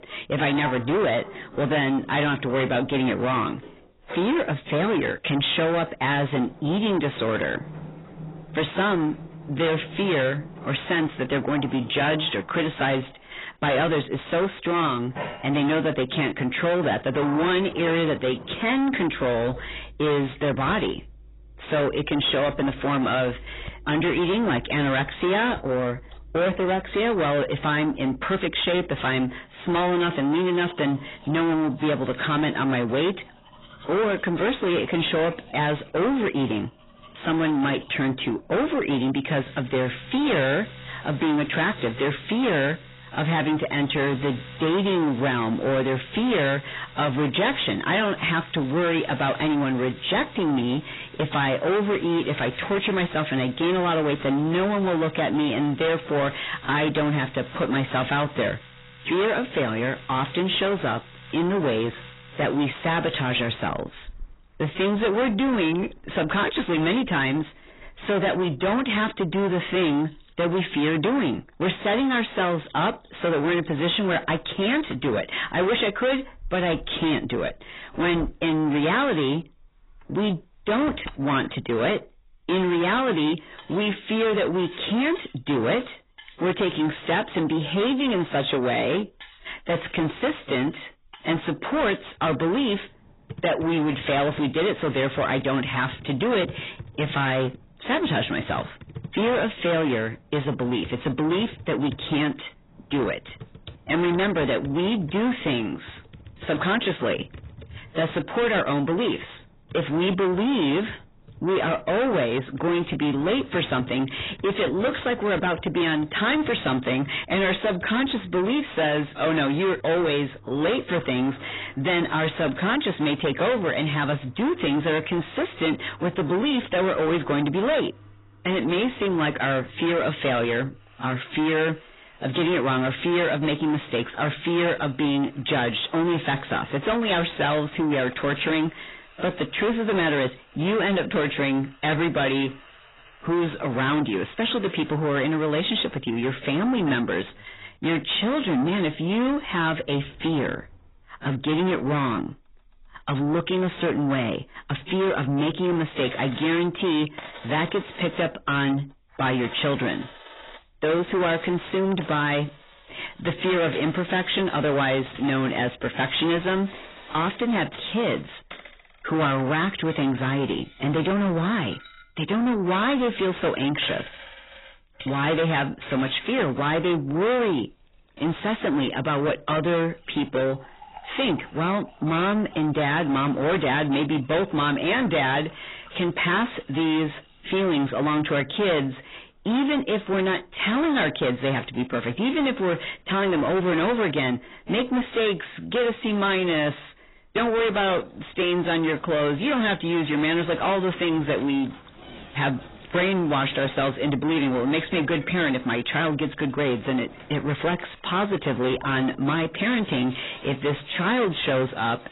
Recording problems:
distortion; heavy; 6 dB below the speech
garbled, watery; badly; nothing above 4 kHz
household noises; faint; throughout; 20 dB below the speech

